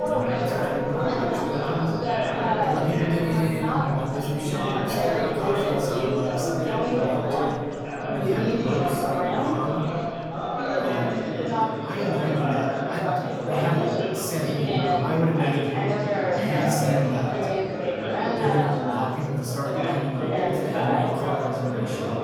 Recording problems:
off-mic speech; far
room echo; noticeable; dies away in 1 s
chatter from many people; very loud; throughout; 3 dB above the speech
background music; loud; throughout; 9 dB below the speech

